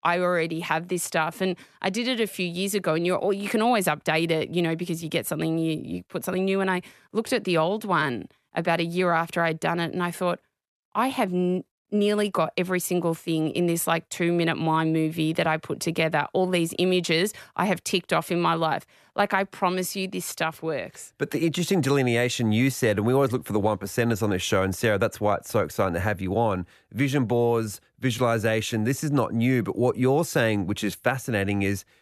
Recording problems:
none

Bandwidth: 13.5 kHz